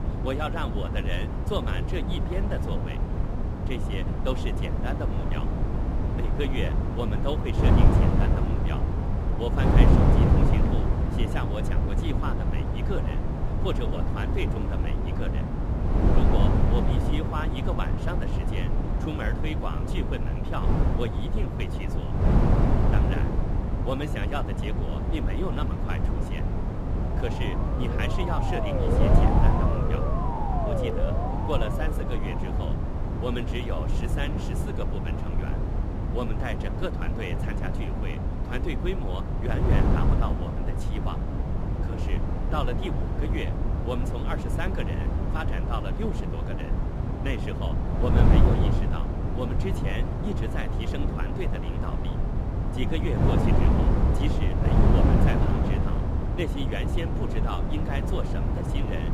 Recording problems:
wind noise on the microphone; heavy; 1 dB above the speech
siren; loud; from 27 to 33 s; peak 6 dB above the speech

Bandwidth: 15.5 kHz